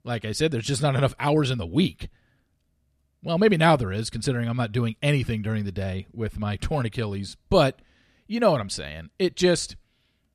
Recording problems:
none

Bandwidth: 14 kHz